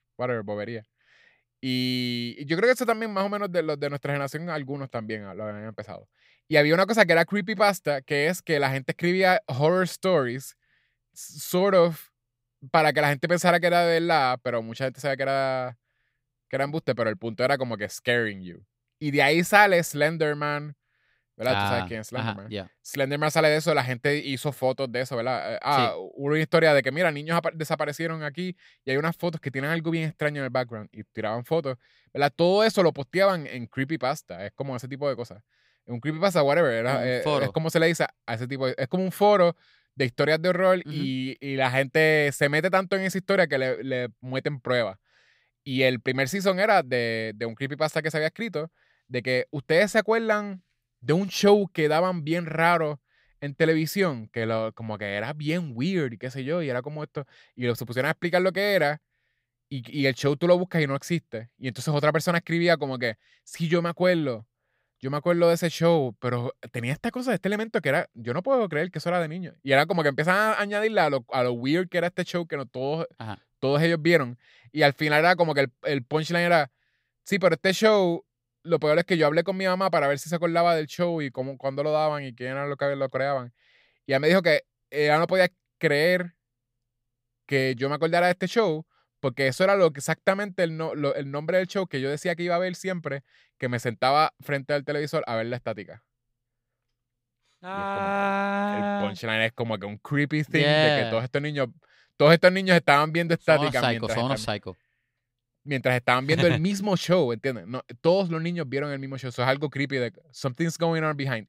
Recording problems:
none

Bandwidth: 15.5 kHz